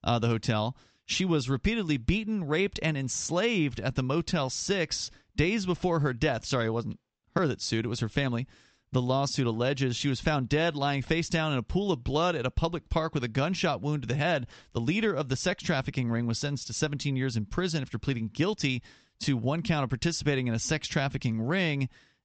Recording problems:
high frequencies cut off; noticeable; nothing above 8 kHz

